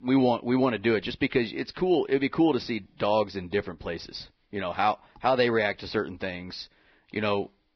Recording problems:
garbled, watery; badly; nothing above 5.5 kHz

